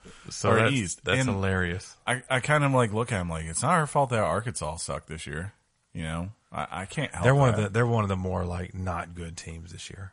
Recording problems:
garbled, watery; slightly; nothing above 10.5 kHz

